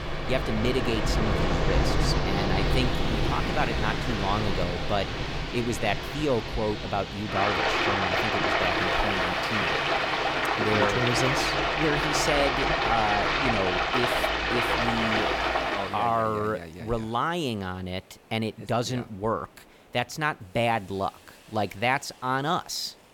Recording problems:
rain or running water; very loud; until 16 s; 3 dB above the speech
hiss; faint; throughout; 25 dB below the speech

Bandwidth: 17.5 kHz